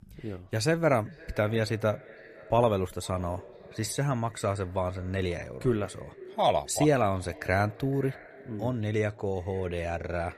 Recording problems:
echo of what is said; faint; throughout; 510 ms later, 20 dB below the speech

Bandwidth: 14.5 kHz